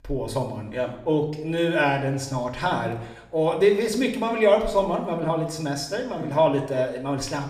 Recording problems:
room echo; slight; dies away in 0.7 s
off-mic speech; somewhat distant

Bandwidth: 15 kHz